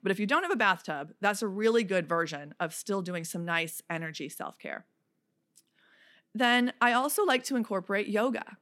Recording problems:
none

